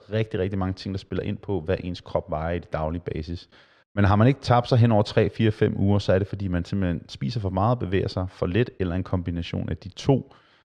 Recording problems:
muffled; slightly; fading above 2.5 kHz

